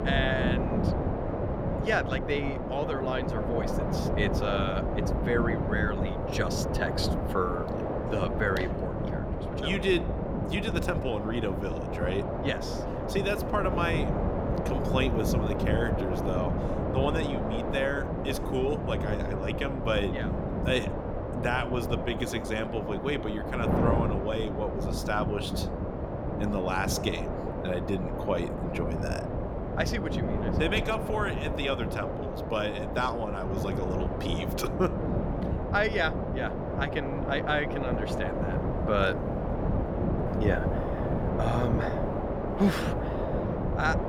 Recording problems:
wind noise on the microphone; heavy; 2 dB below the speech

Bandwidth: 17.5 kHz